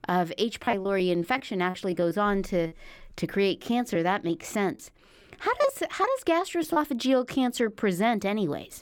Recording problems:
choppy; very; from 0.5 to 3 s and from 3.5 to 7 s; 9% of the speech affected

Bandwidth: 17.5 kHz